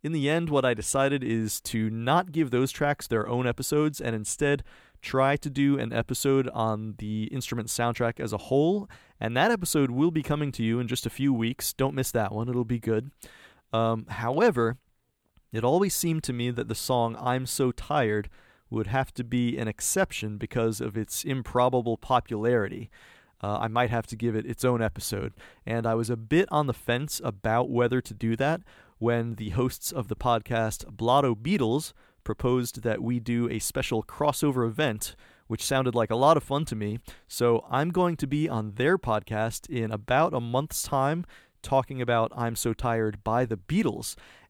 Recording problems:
none

